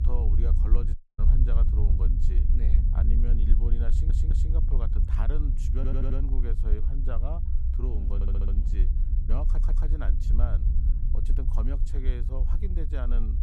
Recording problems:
low rumble; loud; throughout; 3 dB below the speech
audio cutting out; at 1 s
audio stuttering; 4 times, first at 4 s

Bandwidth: 15.5 kHz